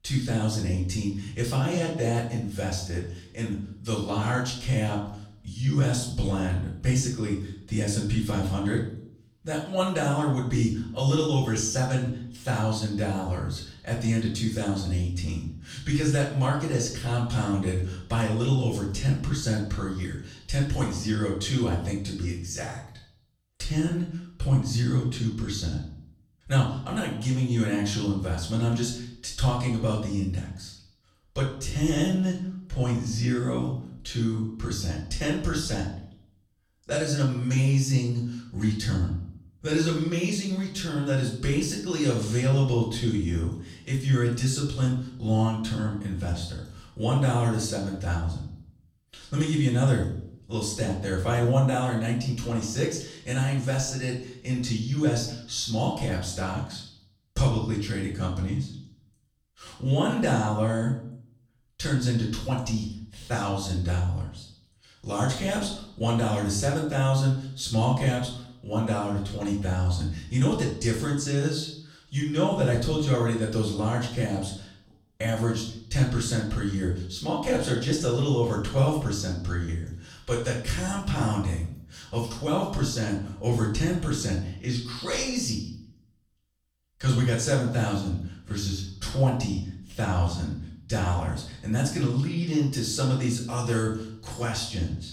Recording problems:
off-mic speech; far
room echo; noticeable; dies away in 0.6 s

